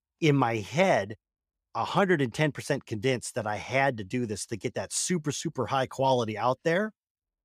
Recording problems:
none

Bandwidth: 15 kHz